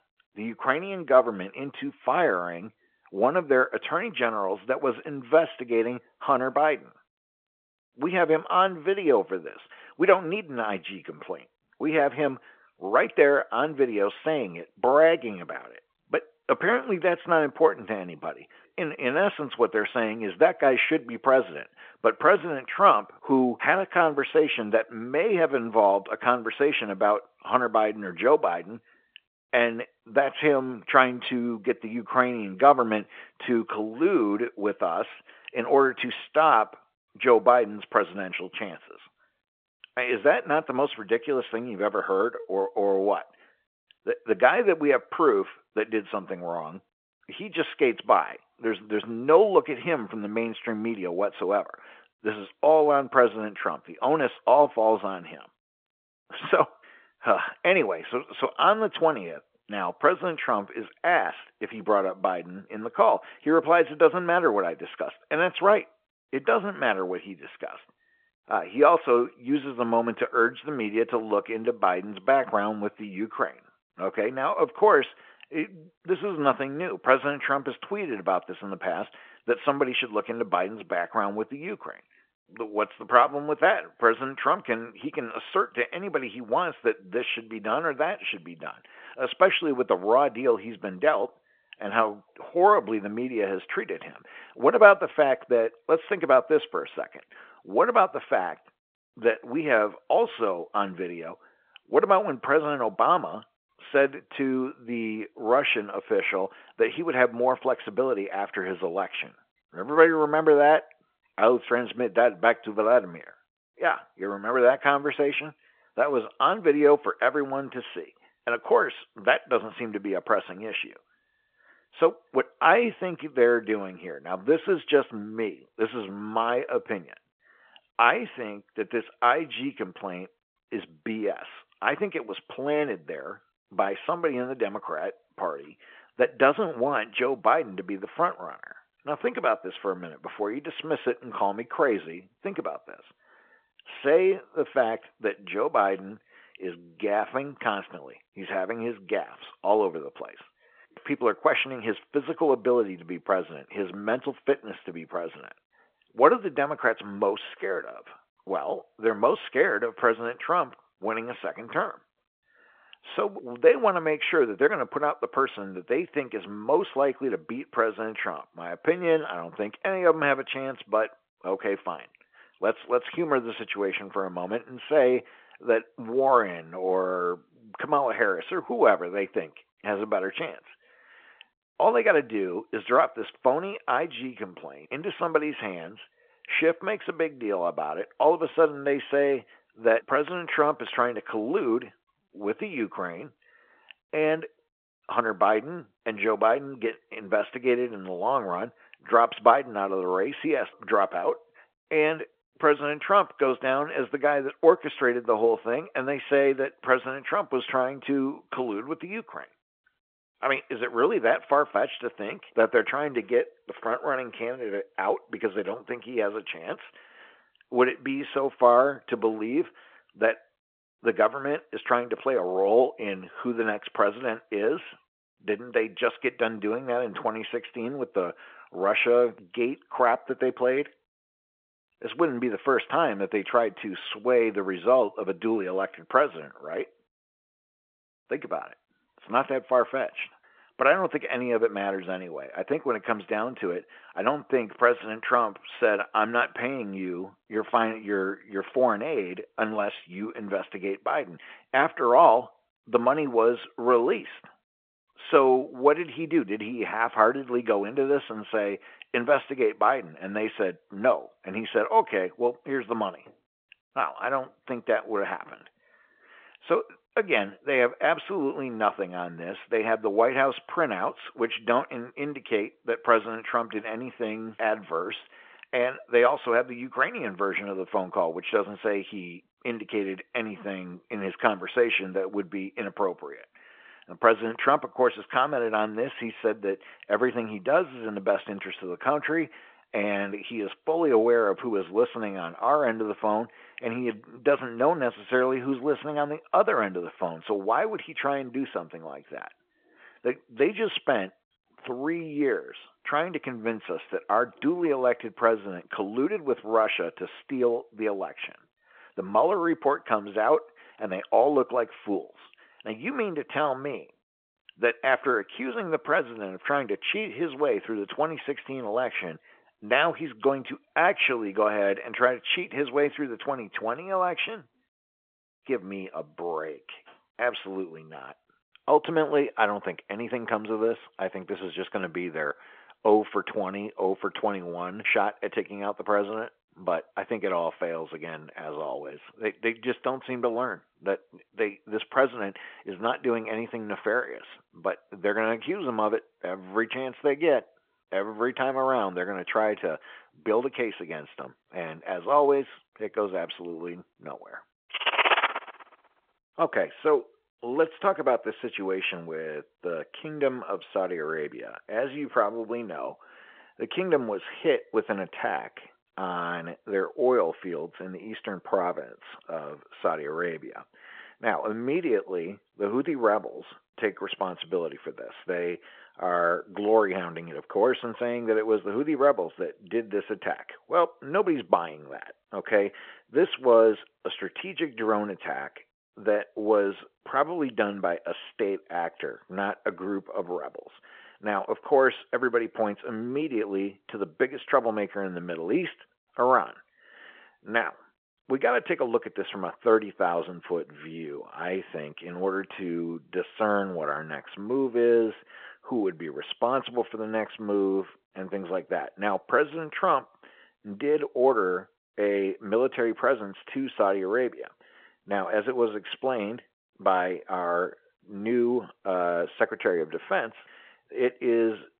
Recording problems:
phone-call audio

